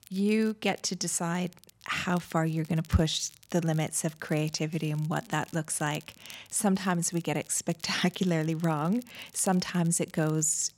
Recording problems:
crackle, like an old record; faint; 25 dB below the speech

